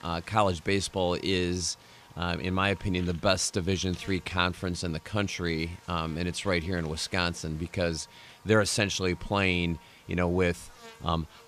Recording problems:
electrical hum; faint; throughout; 60 Hz, 25 dB below the speech

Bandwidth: 15 kHz